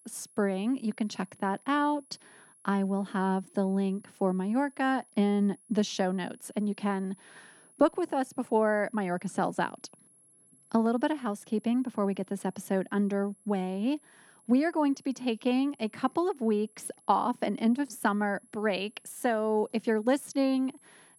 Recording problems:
high-pitched whine; faint; throughout; 10.5 kHz, 30 dB below the speech

